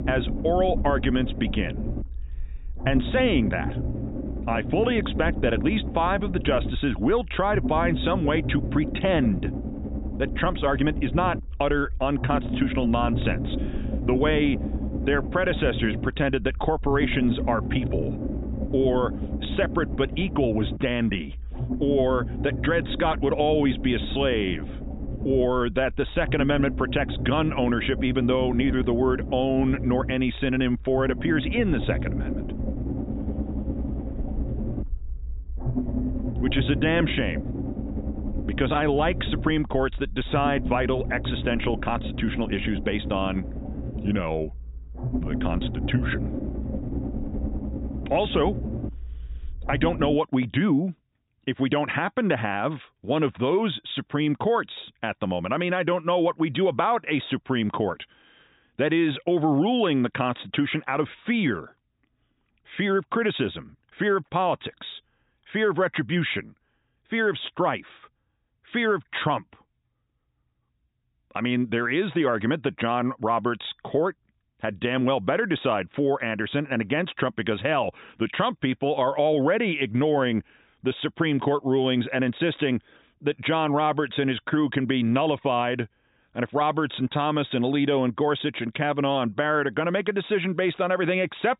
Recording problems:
high frequencies cut off; severe; nothing above 4 kHz
low rumble; noticeable; until 50 s; 10 dB below the speech

